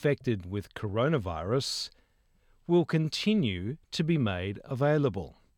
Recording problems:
none

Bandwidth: 18 kHz